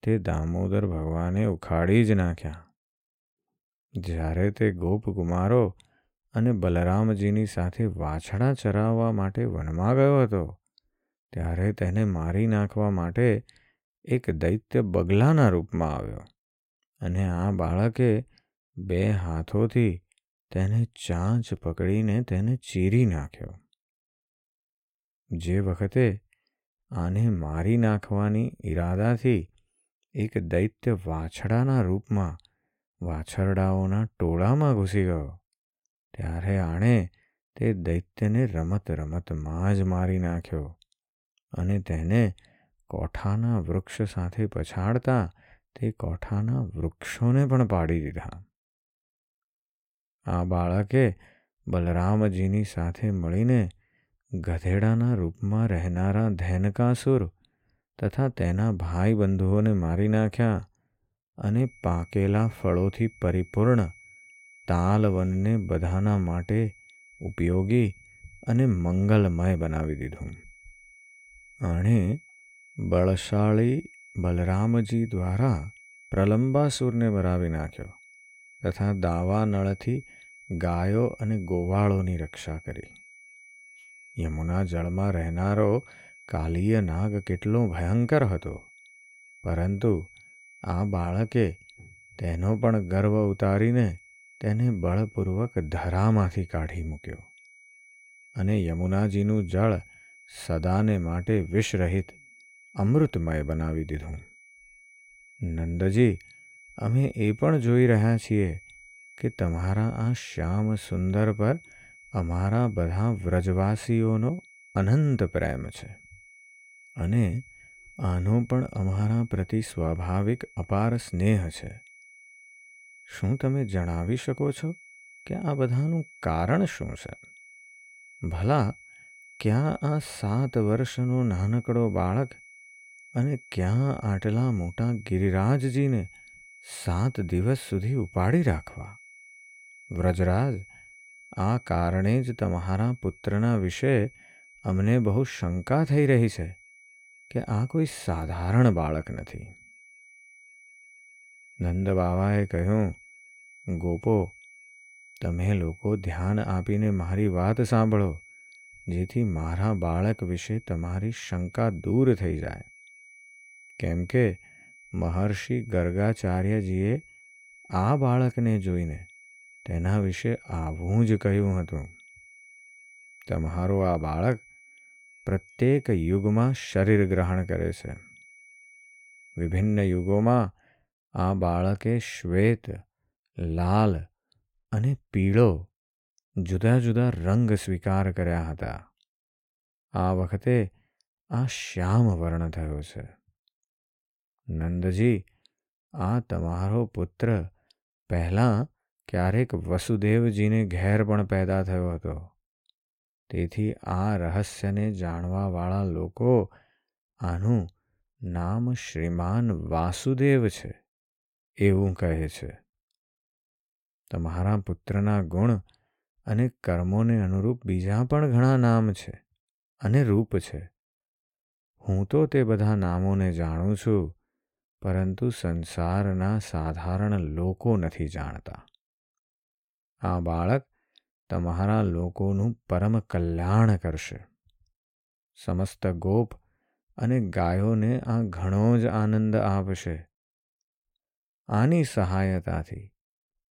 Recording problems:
high-pitched whine; faint; from 1:02 to 3:00; 2 kHz, 25 dB below the speech

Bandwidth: 16.5 kHz